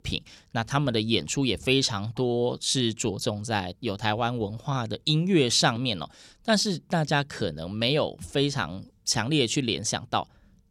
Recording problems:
none

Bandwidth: 18.5 kHz